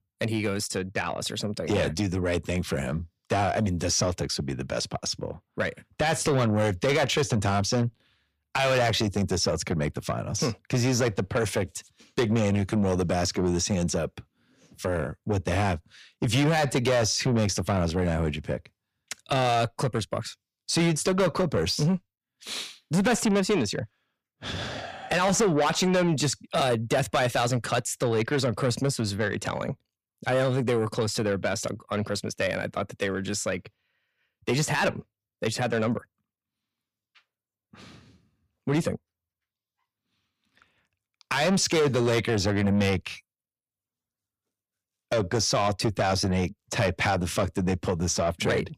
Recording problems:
distortion; heavy; 8 dB below the speech

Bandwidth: 15 kHz